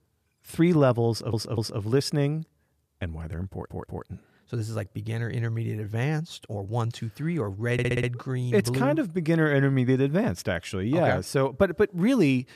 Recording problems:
audio stuttering; at 1 s, at 3.5 s and at 7.5 s

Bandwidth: 14.5 kHz